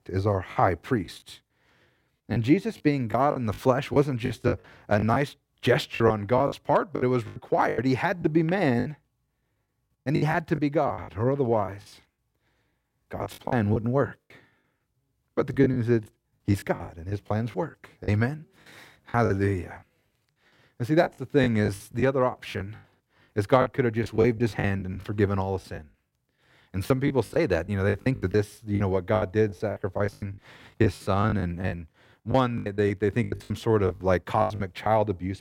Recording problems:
choppy; very; 13% of the speech affected

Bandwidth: 16.5 kHz